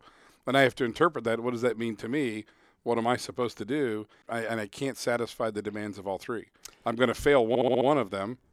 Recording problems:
audio stuttering; at 7.5 s

